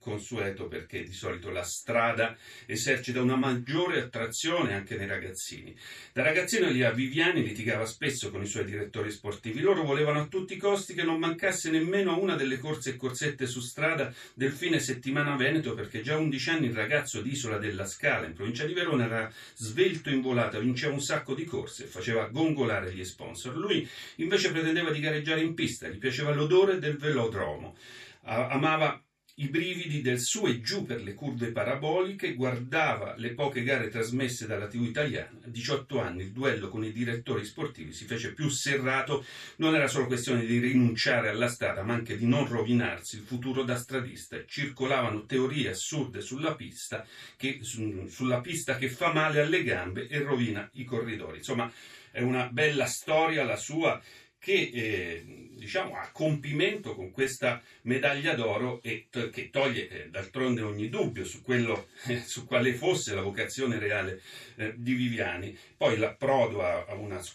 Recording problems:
off-mic speech; far
room echo; slight; dies away in 0.2 s

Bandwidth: 14 kHz